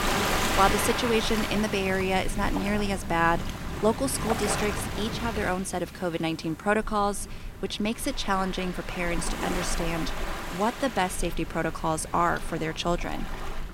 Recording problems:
rain or running water; loud; throughout; 5 dB below the speech

